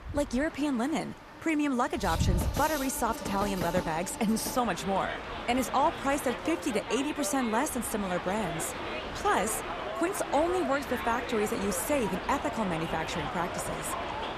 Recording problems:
train or aircraft noise; loud; throughout; 5 dB below the speech
animal sounds; faint; throughout; 30 dB below the speech

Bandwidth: 14.5 kHz